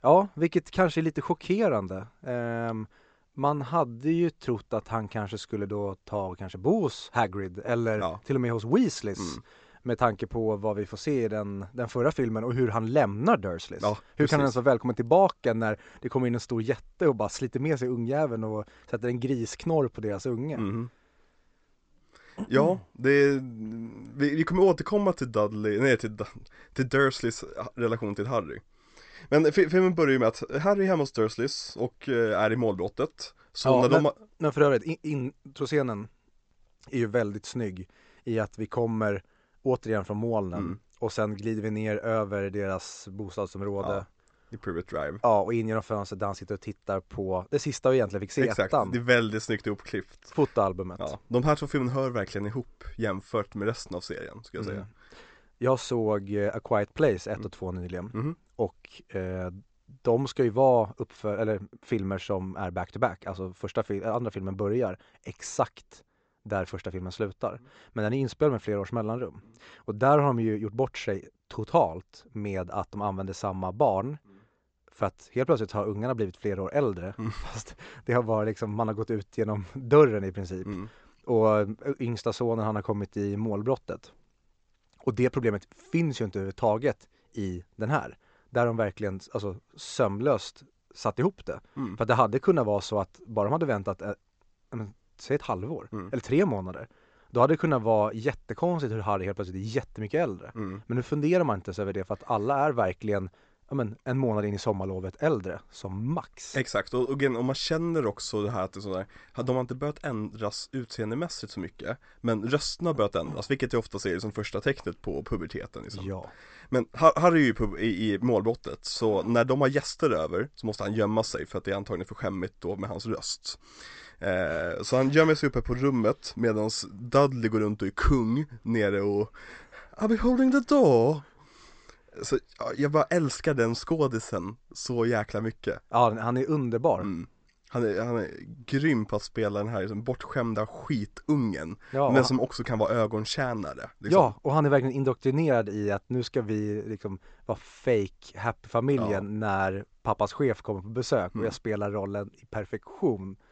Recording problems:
high frequencies cut off; noticeable; nothing above 8 kHz

